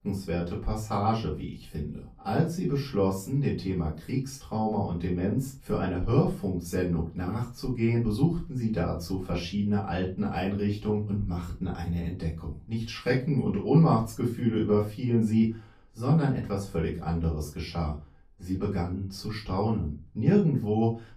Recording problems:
off-mic speech; far
room echo; slight; dies away in 0.3 s

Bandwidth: 14.5 kHz